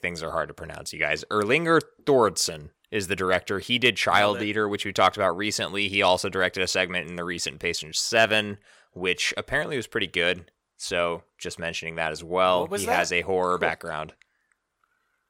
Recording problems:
none

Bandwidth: 16.5 kHz